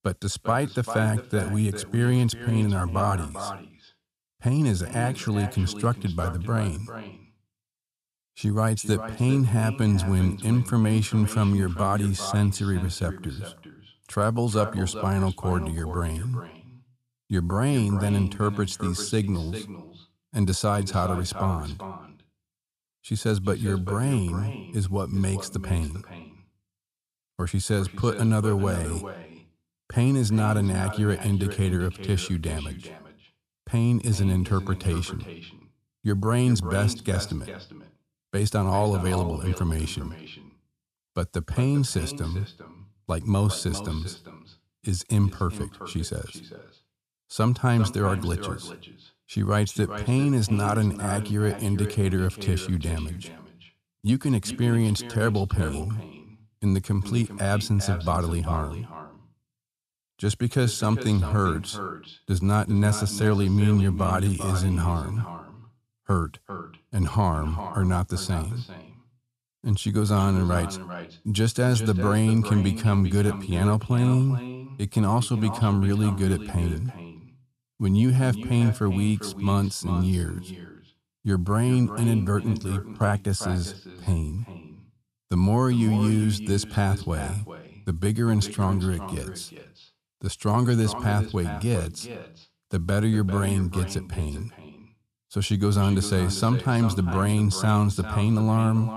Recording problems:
echo of what is said; noticeable; throughout; 400 ms later, 15 dB below the speech

